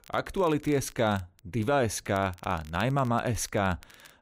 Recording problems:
crackle, like an old record; faint; 25 dB below the speech

